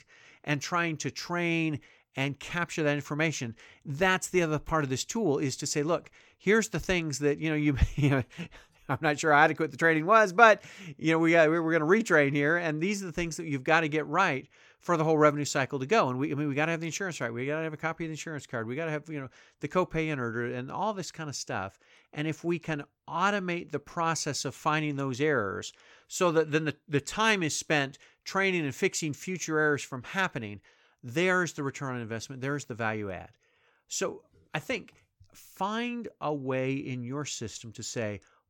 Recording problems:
none

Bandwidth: 17.5 kHz